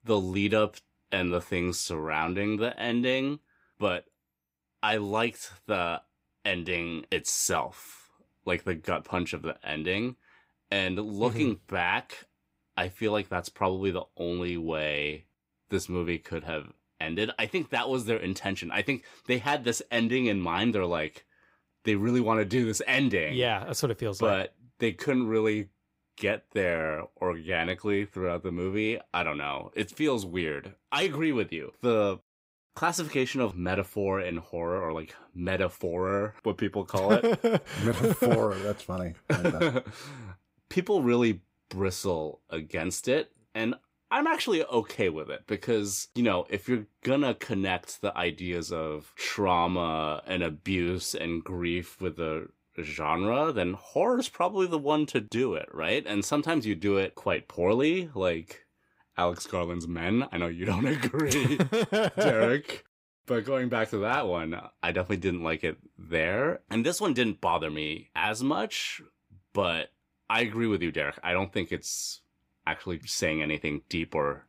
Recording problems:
none

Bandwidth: 15.5 kHz